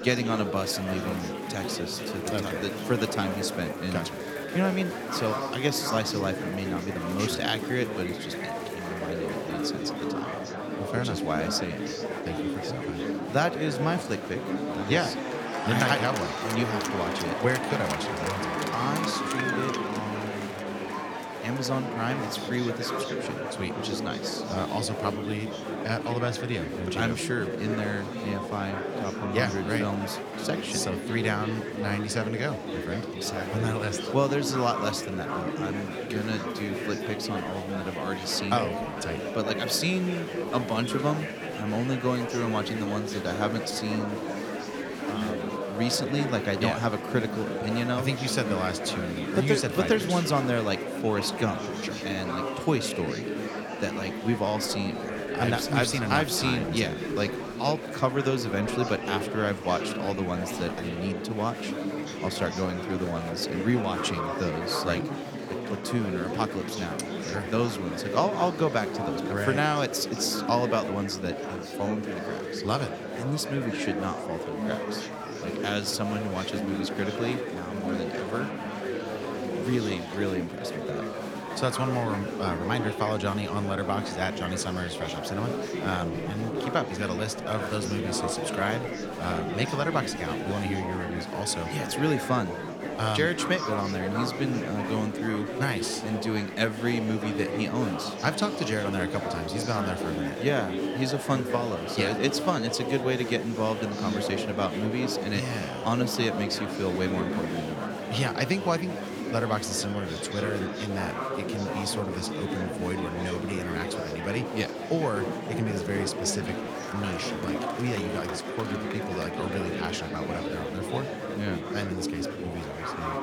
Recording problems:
murmuring crowd; loud; throughout; 2 dB below the speech

